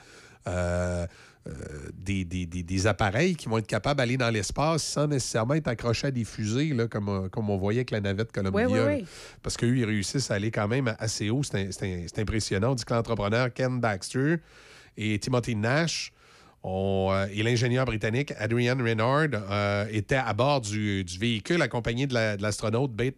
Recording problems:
none

